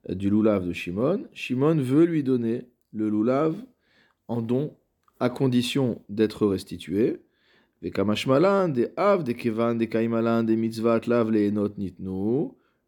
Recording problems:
none

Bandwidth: 18.5 kHz